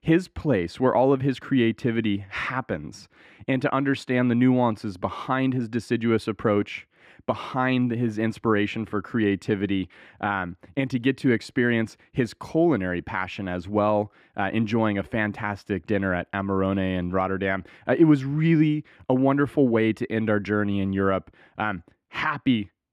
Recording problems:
muffled; slightly; fading above 3 kHz

